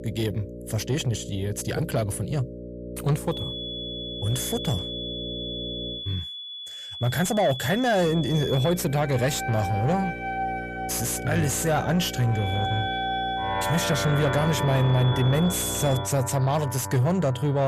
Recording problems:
distortion; slight; 10 dB below the speech
high-pitched whine; loud; from 3.5 to 8.5 s and from 12 to 16 s; 3.5 kHz, 9 dB below the speech
background music; loud; from 9 s on; 6 dB below the speech
electrical hum; noticeable; until 6 s and from 8 to 16 s; 60 Hz, 10 dB below the speech
abrupt cut into speech; at the end

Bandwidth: 14.5 kHz